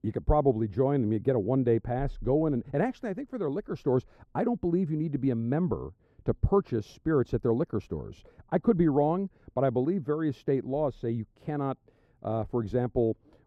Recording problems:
muffled; very; fading above 1.5 kHz

